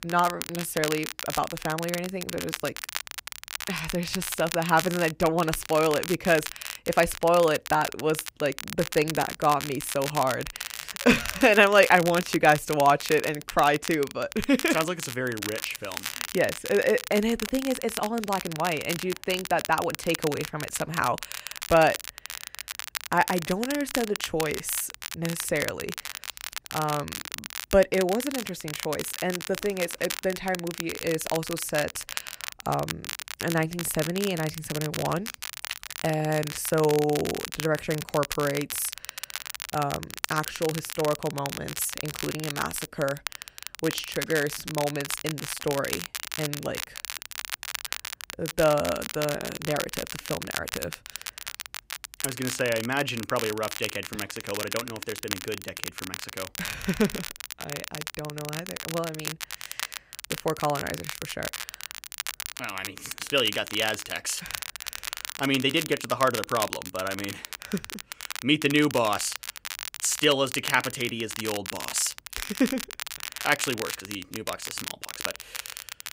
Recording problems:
crackle, like an old record; loud; 8 dB below the speech

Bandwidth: 15.5 kHz